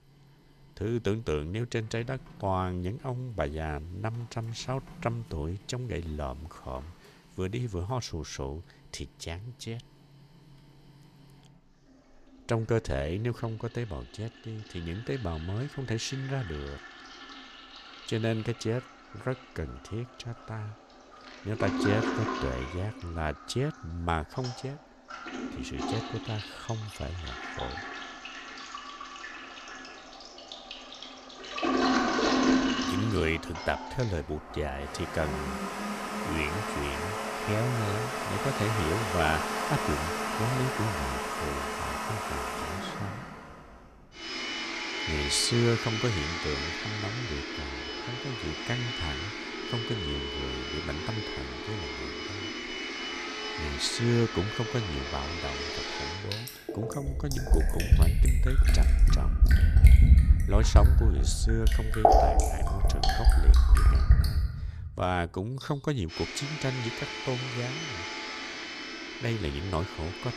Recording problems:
household noises; very loud; throughout; 4 dB above the speech

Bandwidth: 14.5 kHz